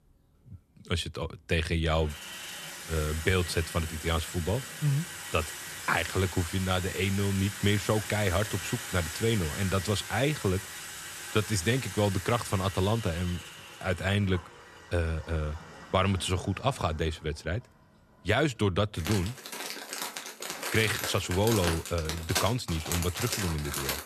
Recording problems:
household noises; loud; throughout; 7 dB below the speech

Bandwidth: 13.5 kHz